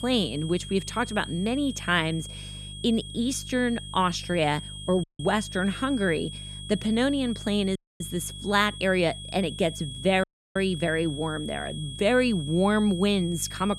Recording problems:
high-pitched whine; noticeable; throughout; 3.5 kHz, 10 dB below the speech
electrical hum; faint; throughout; 50 Hz, 30 dB below the speech
audio cutting out; at 5 s, at 8 s and at 10 s

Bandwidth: 14.5 kHz